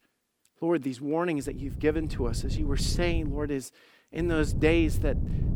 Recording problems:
wind noise on the microphone; occasional gusts; from 1.5 to 3.5 s and from 4 s on; 15 dB below the speech

